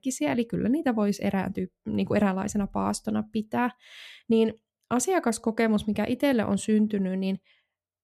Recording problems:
none

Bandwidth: 14.5 kHz